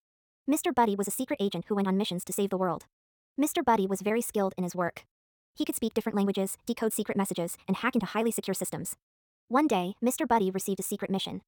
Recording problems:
wrong speed, natural pitch; too fast; 1.7 times normal speed

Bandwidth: 18 kHz